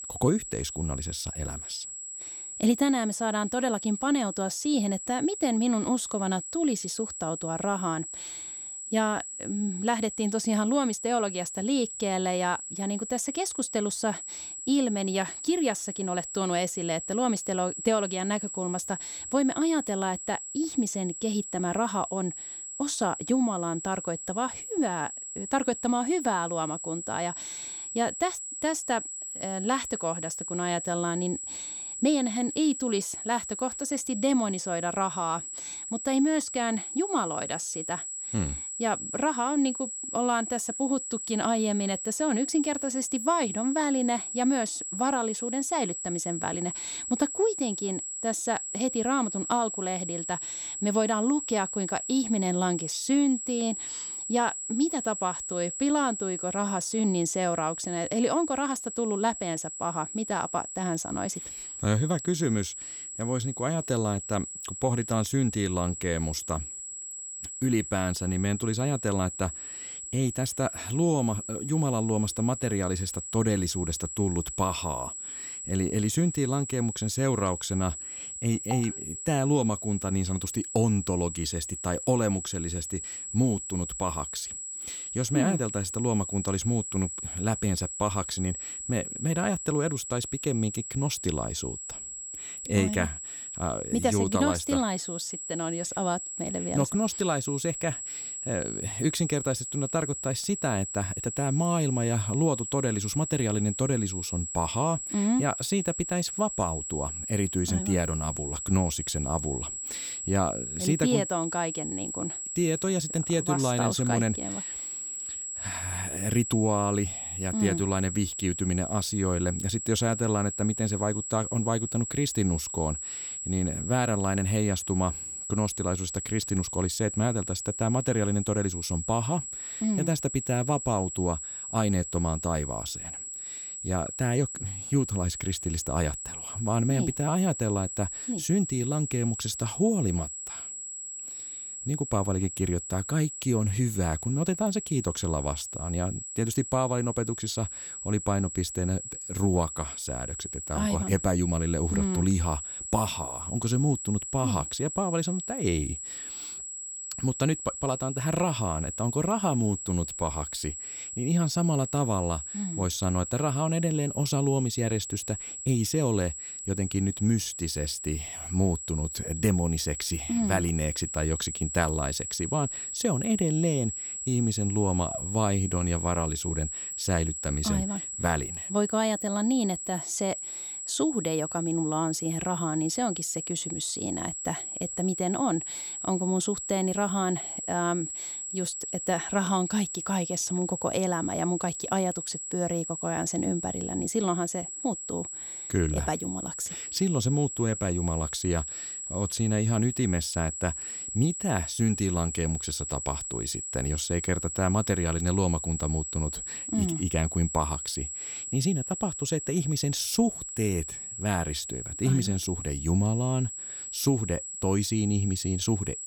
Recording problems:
high-pitched whine; loud; throughout; 7.5 kHz, 5 dB below the speech

